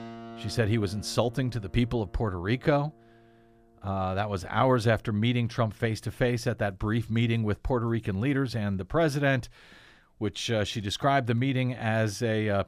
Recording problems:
background music; faint; throughout; 20 dB below the speech

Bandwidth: 15 kHz